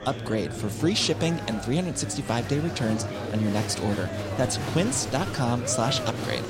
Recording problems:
murmuring crowd; loud; throughout; 6 dB below the speech

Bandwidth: 16 kHz